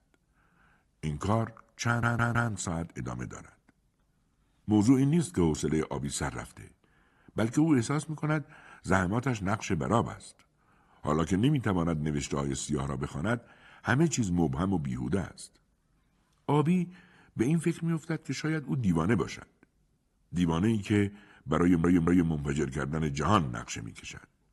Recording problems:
audio stuttering; at 2 s and at 22 s

